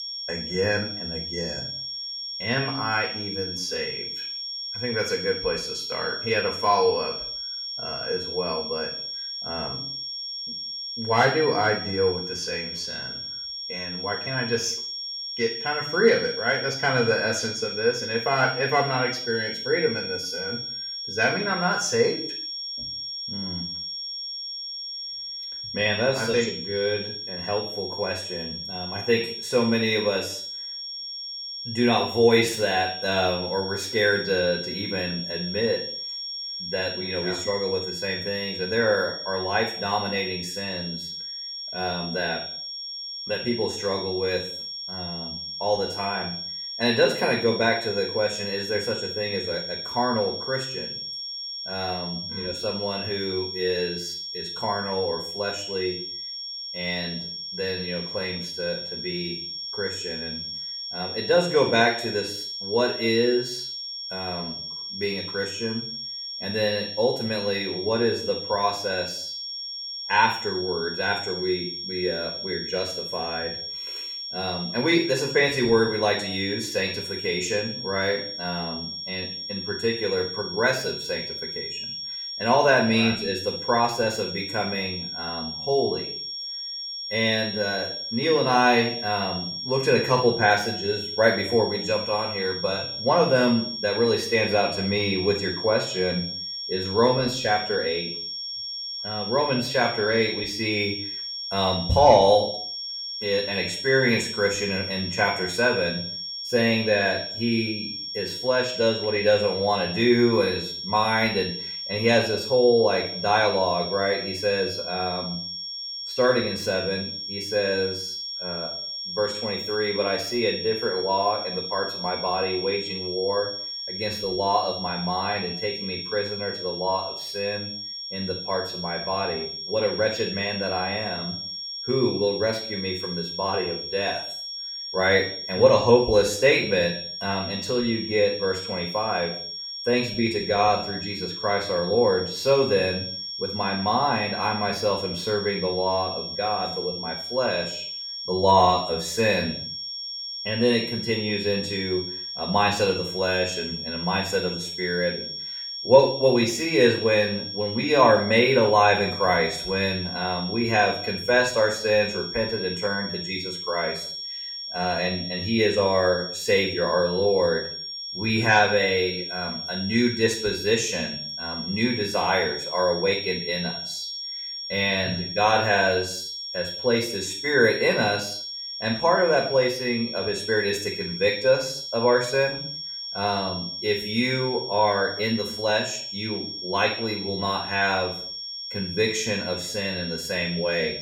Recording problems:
off-mic speech; far
room echo; noticeable; dies away in 0.5 s
high-pitched whine; loud; throughout; 5.5 kHz, 6 dB below the speech

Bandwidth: 17.5 kHz